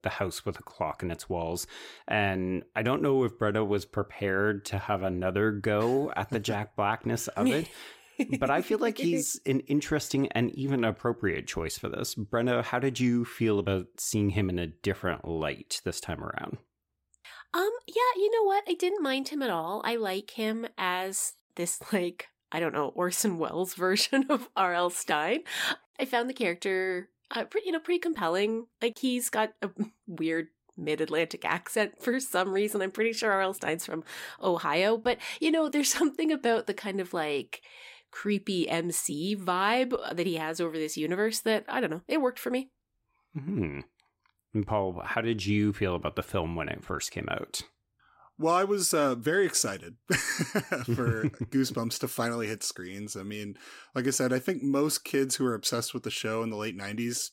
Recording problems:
none

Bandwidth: 16 kHz